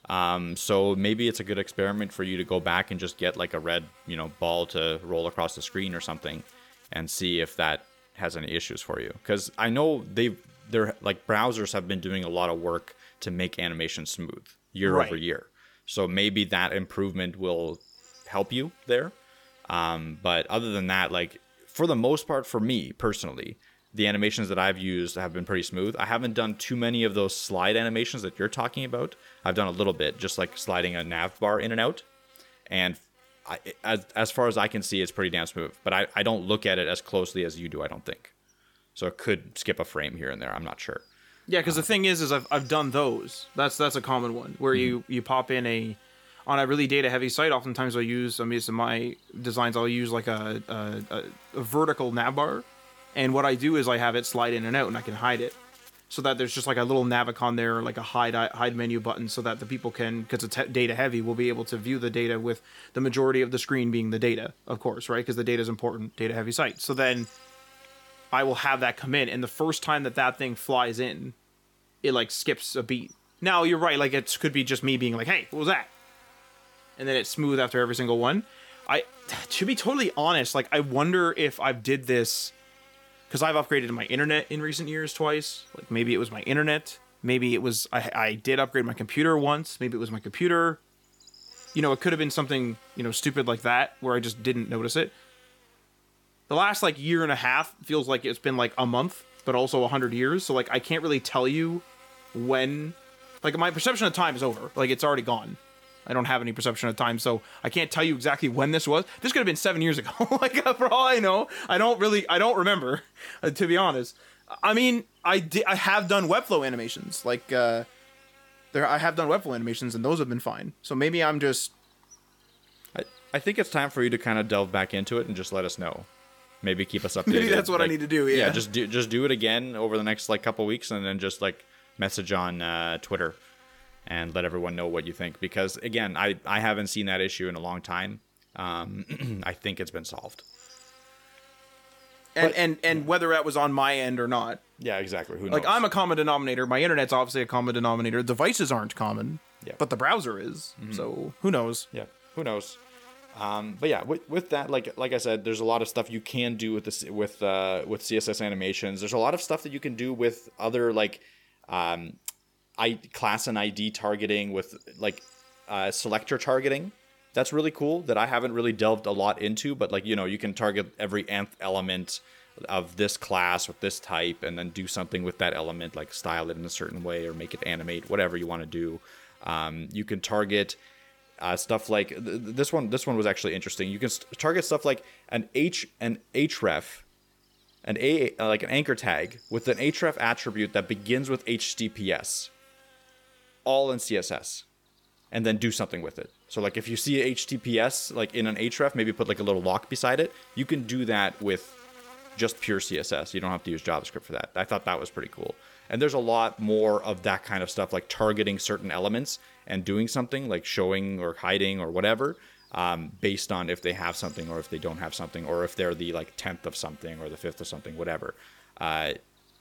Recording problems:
electrical hum; faint; throughout; 50 Hz, 25 dB below the speech

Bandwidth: 18 kHz